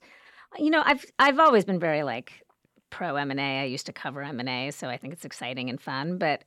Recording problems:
none

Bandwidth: 17.5 kHz